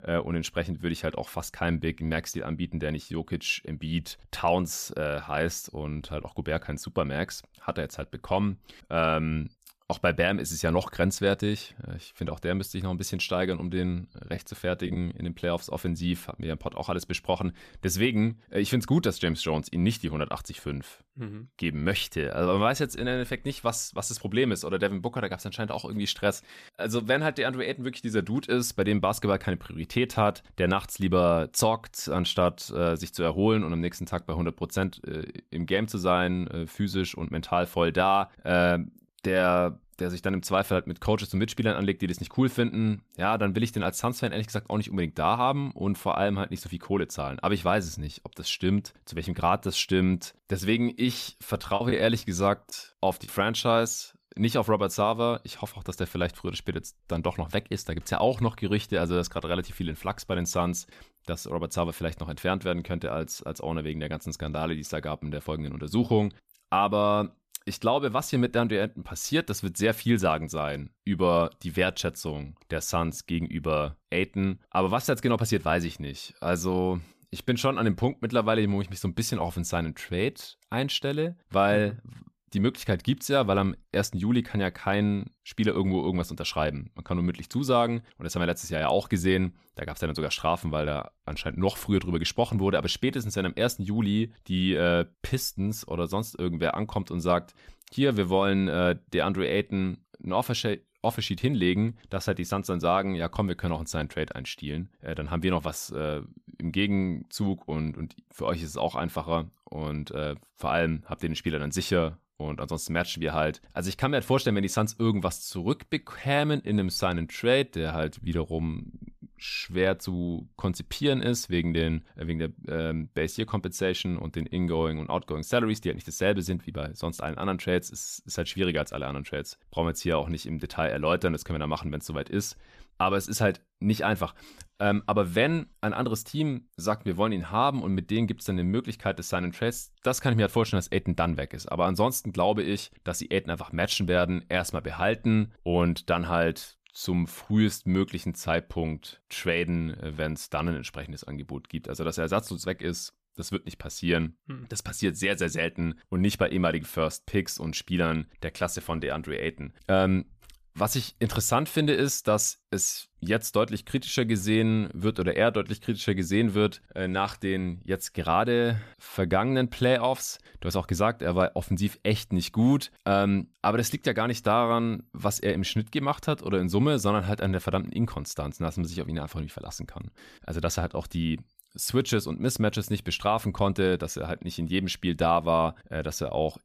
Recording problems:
choppy; very; from 52 to 53 s; 6% of the speech affected

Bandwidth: 14.5 kHz